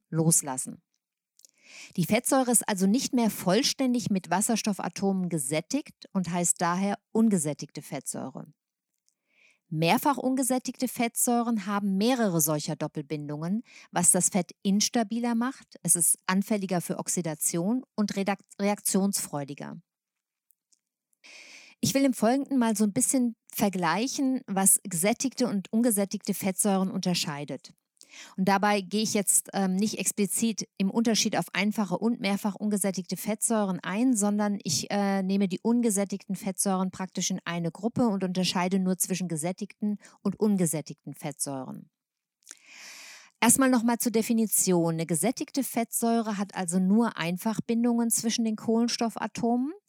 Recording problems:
none

